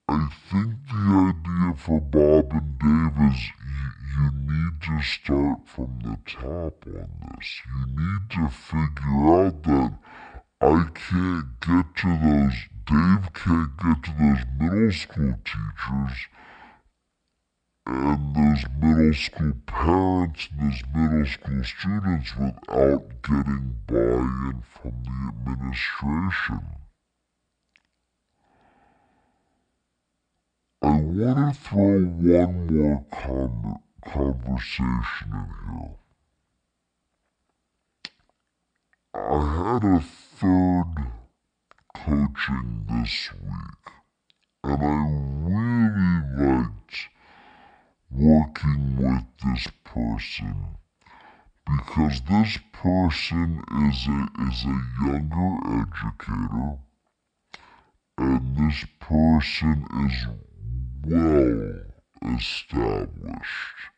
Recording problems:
wrong speed and pitch; too slow and too low; 0.5 times normal speed

